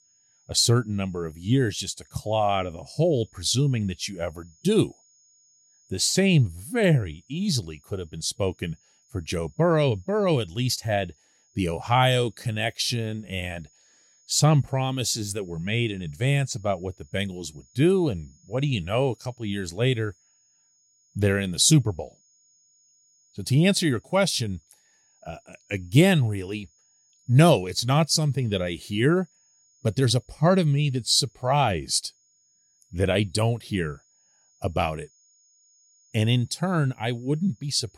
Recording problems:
high-pitched whine; faint; throughout; 6.5 kHz, 35 dB below the speech

